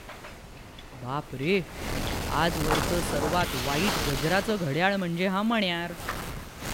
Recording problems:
wind noise on the microphone; heavy; 3 dB below the speech

